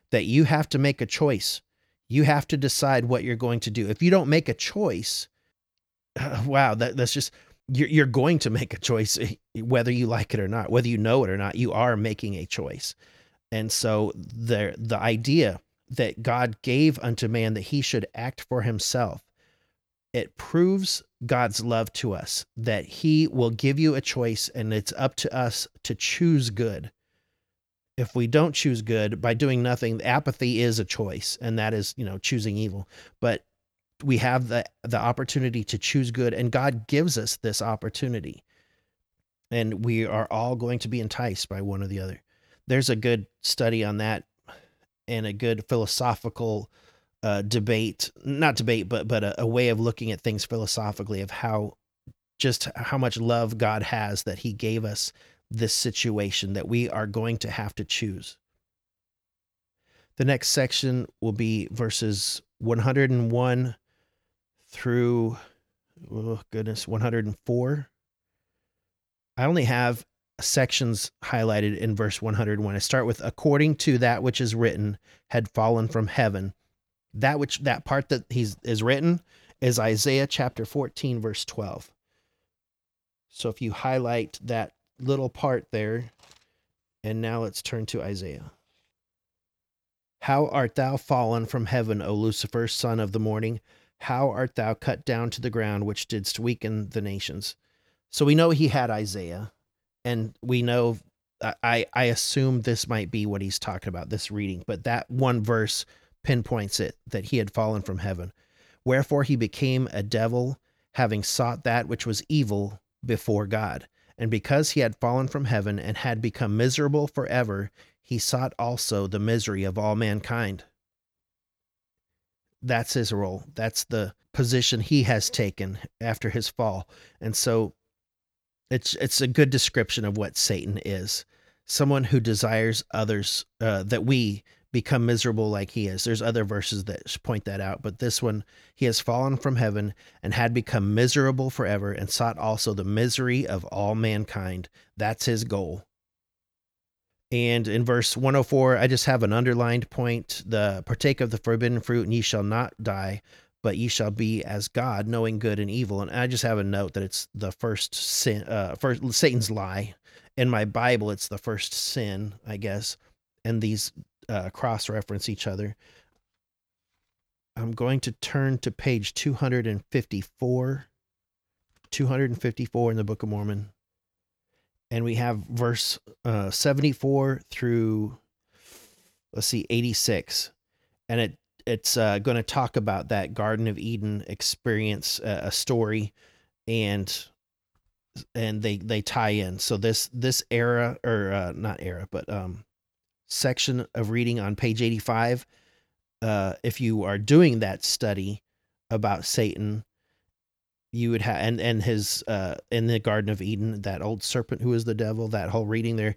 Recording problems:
none

